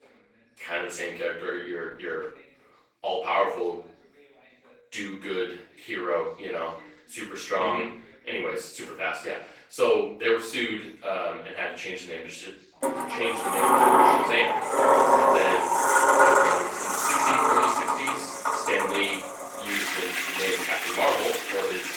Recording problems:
off-mic speech; far
room echo; noticeable; dies away in 0.4 s
thin; somewhat; fading below 400 Hz
garbled, watery; slightly; nothing above 18 kHz
household noises; very loud; from 13 s on; 7 dB above the speech
voice in the background; faint; throughout; 25 dB below the speech

